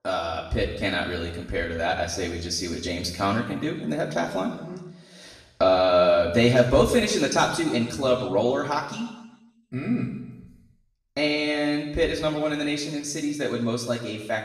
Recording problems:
off-mic speech; far
room echo; noticeable; dies away in 1 s

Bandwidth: 13.5 kHz